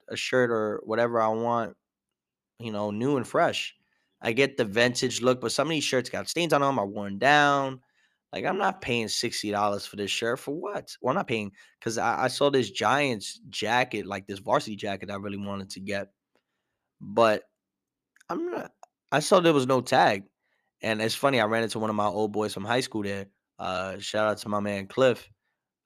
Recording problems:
uneven, jittery; strongly; from 1 to 24 s

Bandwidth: 14.5 kHz